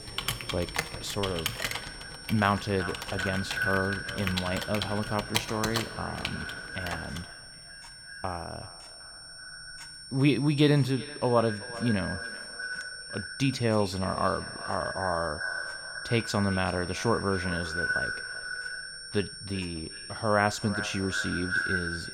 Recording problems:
echo of what is said; strong; throughout; 380 ms later, 6 dB below the speech
household noises; loud; throughout; 5 dB below the speech
high-pitched whine; noticeable; throughout; 5.5 kHz, 10 dB below the speech

